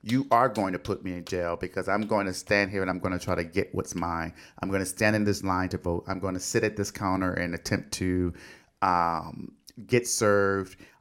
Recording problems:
none

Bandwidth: 16.5 kHz